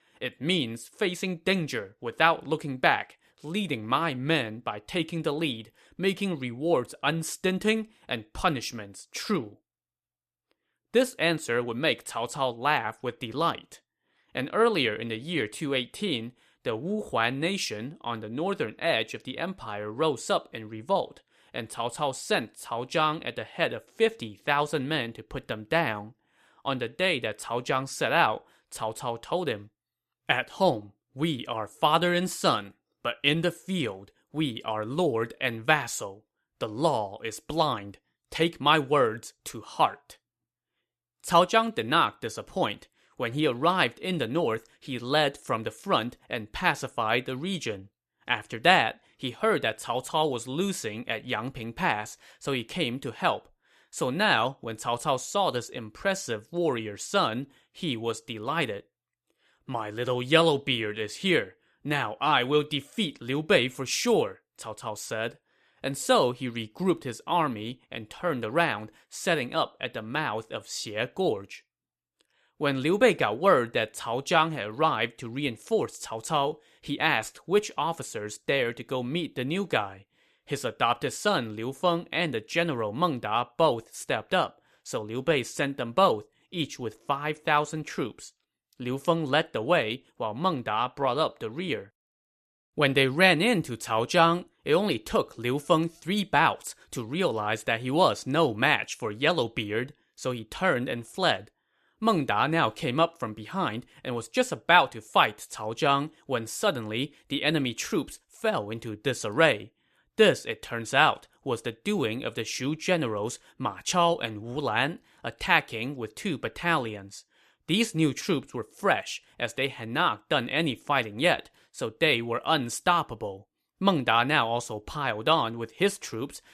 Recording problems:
none

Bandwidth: 14 kHz